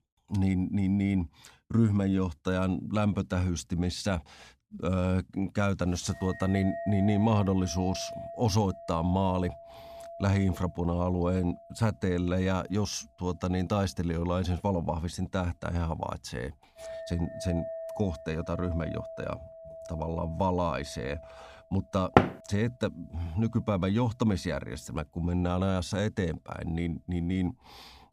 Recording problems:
household noises; noticeable; from 6.5 s on; 15 dB below the speech
door banging; loud; at 22 s; peak 6 dB above the speech

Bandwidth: 15 kHz